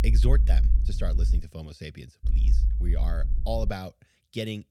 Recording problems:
low rumble; loud; until 1.5 s and from 2 to 3.5 s; 10 dB below the speech

